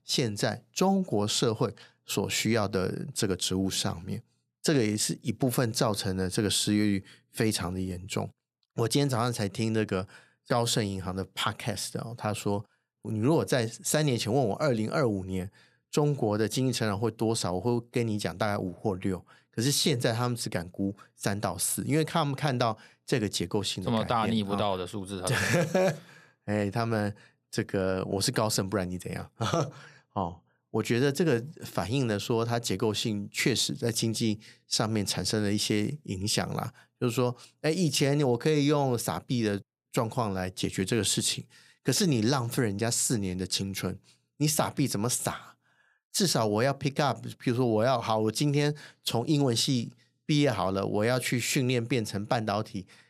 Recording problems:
none

